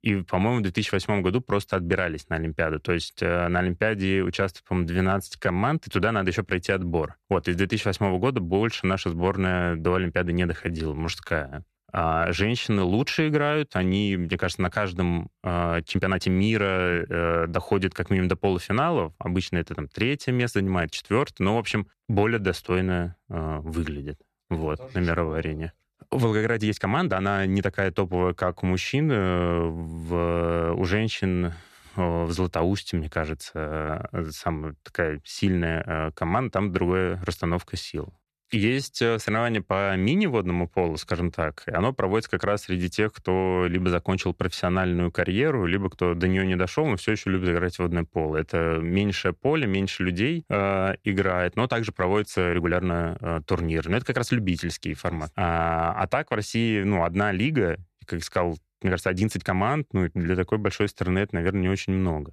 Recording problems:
uneven, jittery; strongly; from 4.5 s to 1:00

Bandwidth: 13.5 kHz